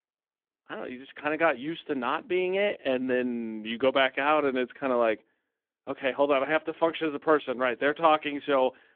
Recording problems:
phone-call audio

